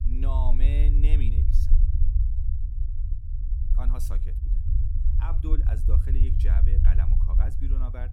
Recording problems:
low rumble; loud; throughout; 3 dB below the speech

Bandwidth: 17 kHz